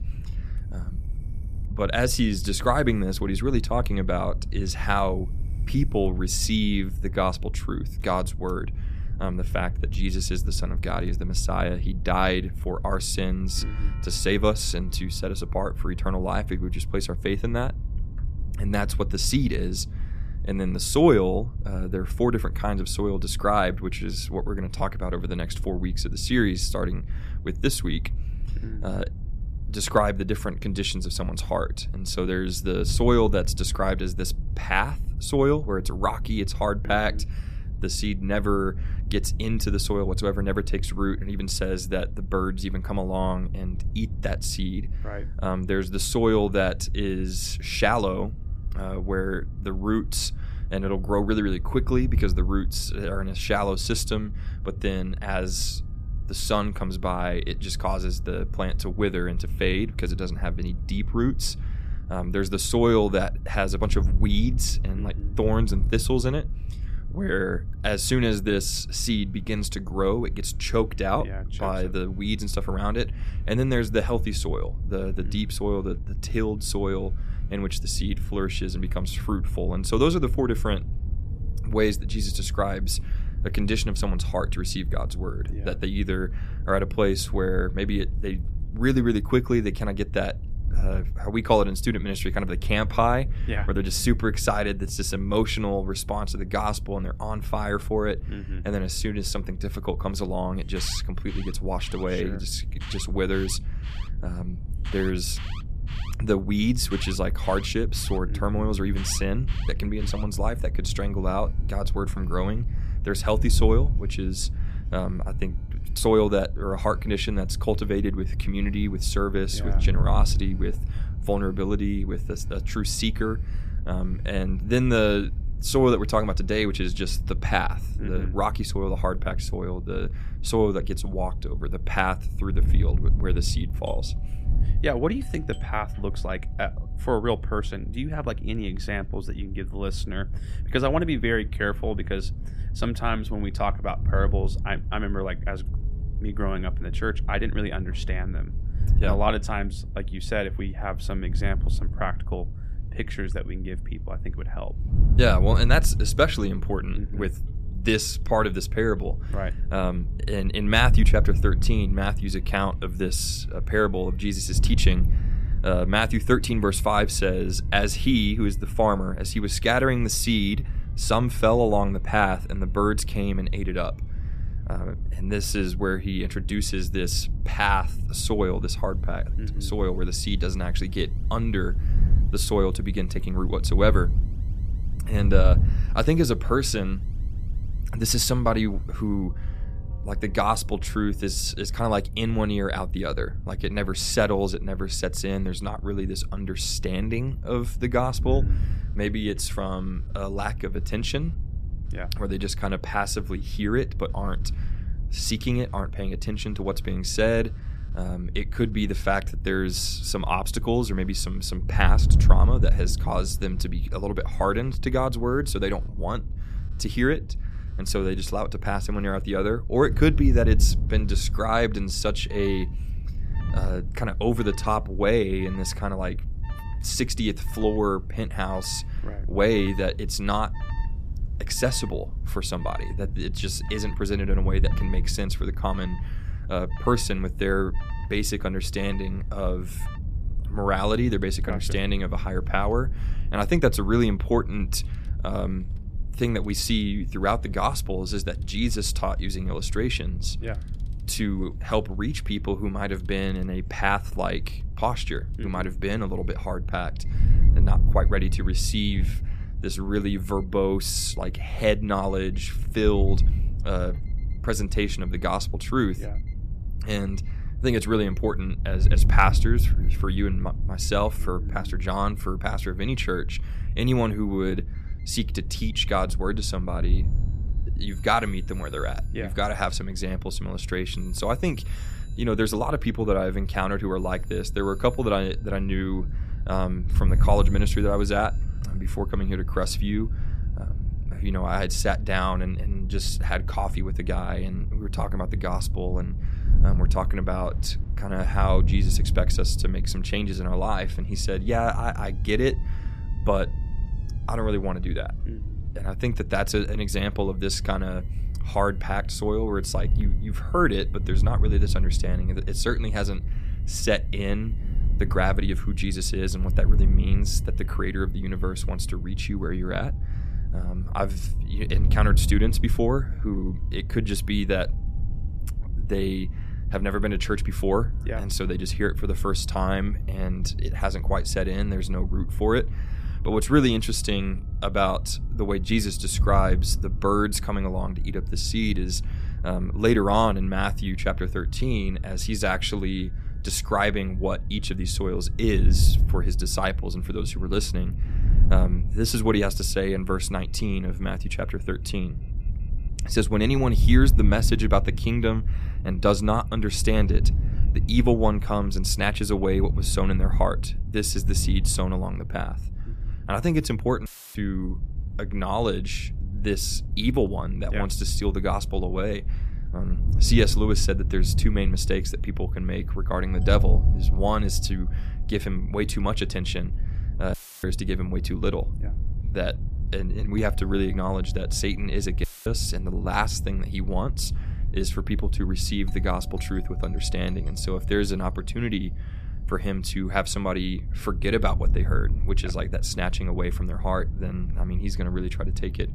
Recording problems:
wind noise on the microphone; occasional gusts; 20 dB below the speech
alarms or sirens; faint; throughout; 25 dB below the speech
audio cutting out; filled with static; at 6:04, at 6:17 and at 6:22

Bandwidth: 14.5 kHz